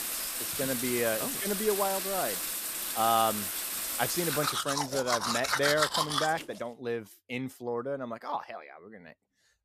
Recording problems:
household noises; very loud; until 6.5 s; 1 dB above the speech

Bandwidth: 14.5 kHz